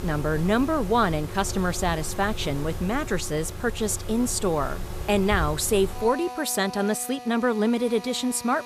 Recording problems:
machinery noise; noticeable; throughout; 10 dB below the speech

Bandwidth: 14.5 kHz